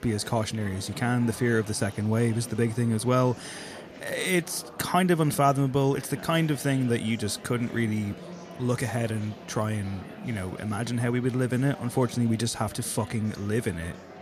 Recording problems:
murmuring crowd; noticeable; throughout; 15 dB below the speech

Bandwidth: 14.5 kHz